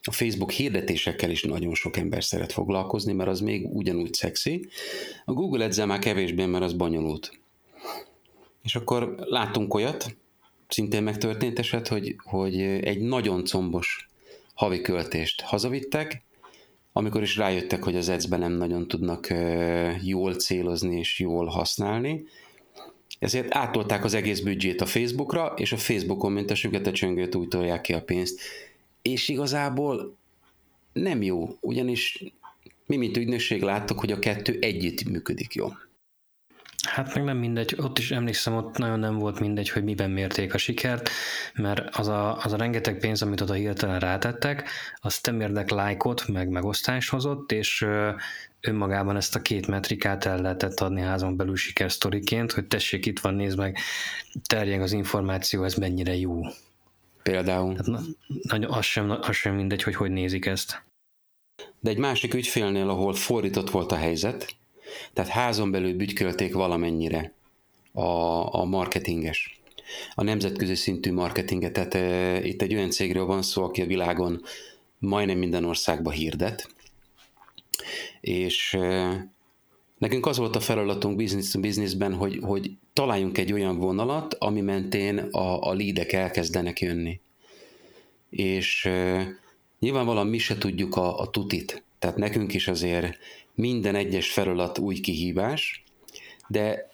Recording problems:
squashed, flat; heavily

